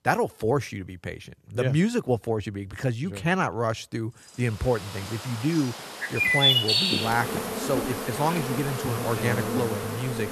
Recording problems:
animal sounds; very loud; from 4.5 s on; 3 dB above the speech

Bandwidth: 13.5 kHz